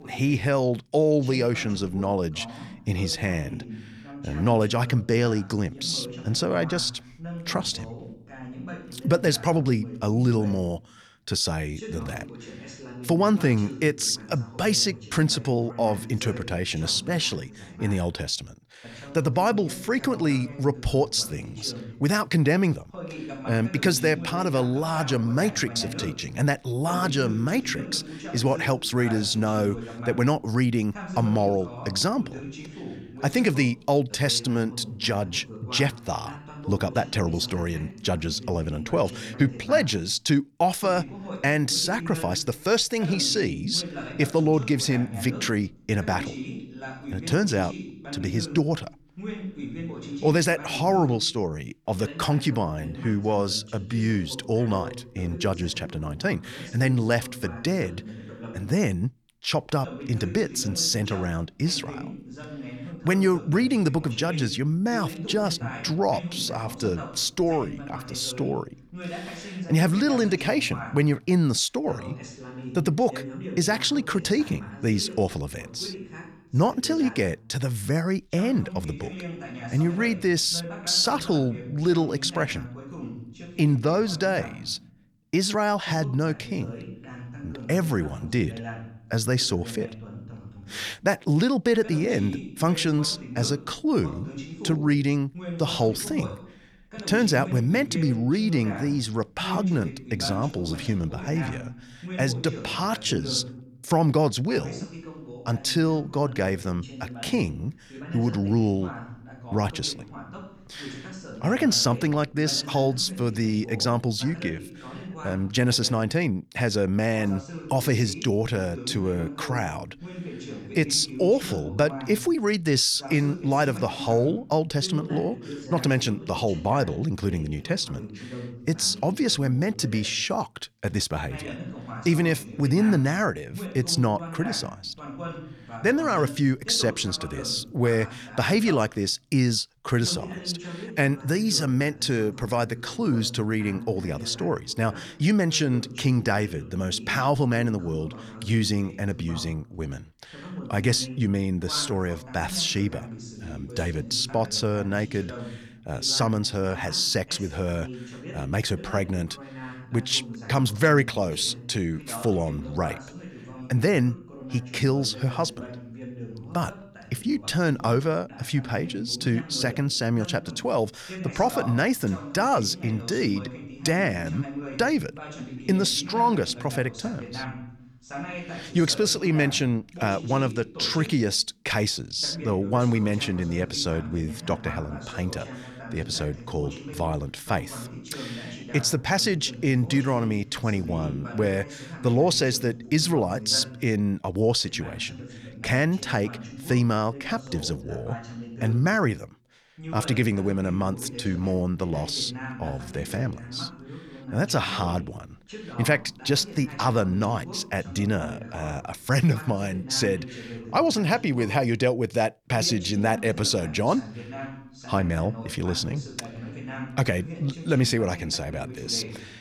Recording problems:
voice in the background; noticeable; throughout; 15 dB below the speech

